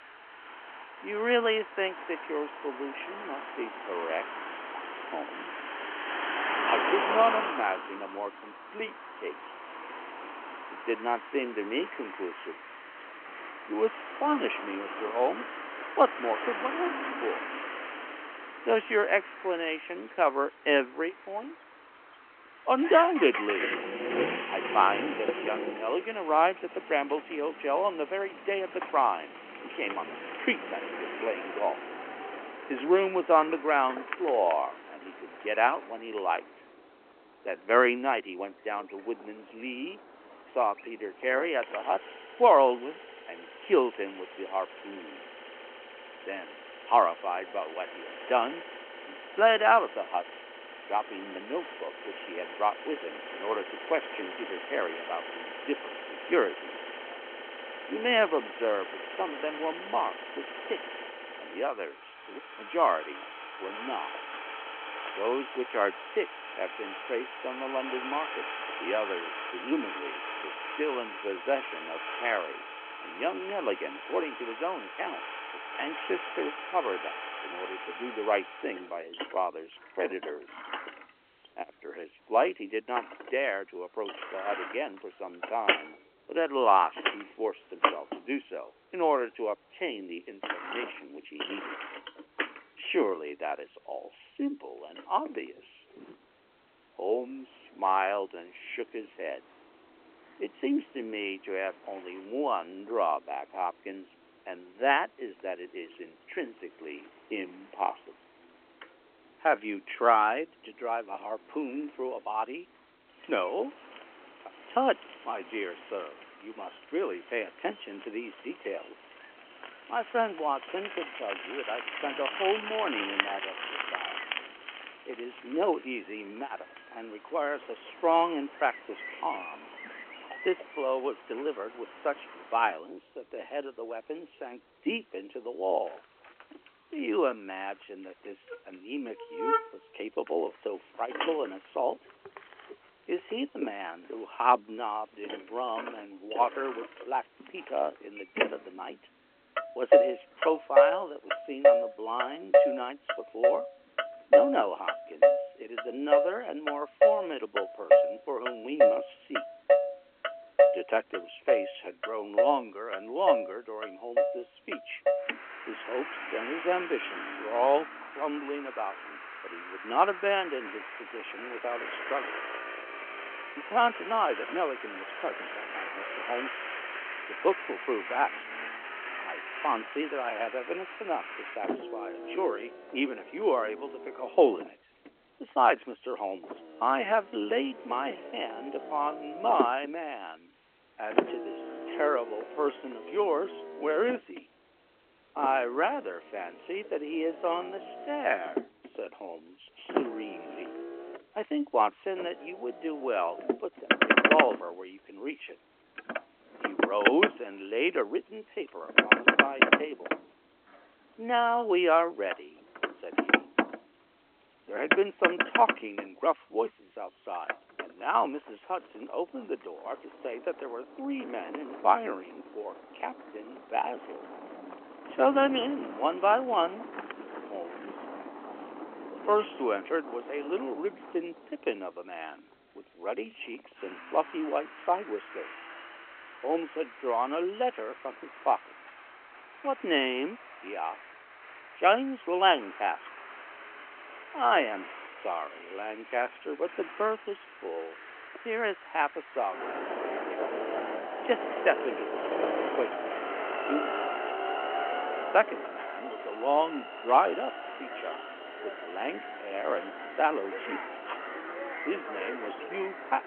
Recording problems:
phone-call audio
traffic noise; loud; throughout; 2 dB below the speech

